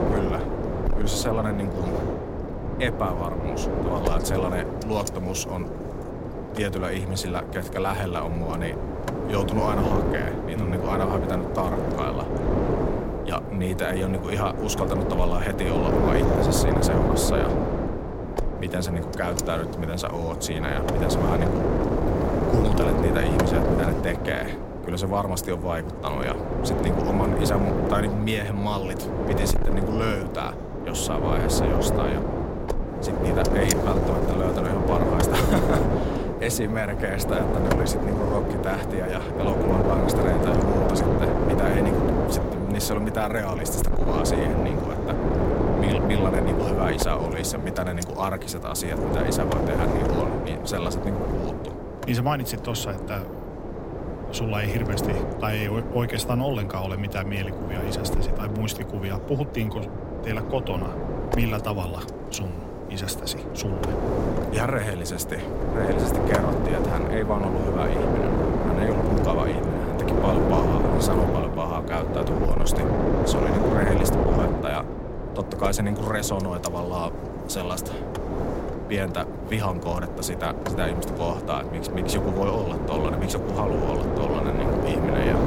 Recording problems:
wind noise on the microphone; heavy; 1 dB above the speech

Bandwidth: 16 kHz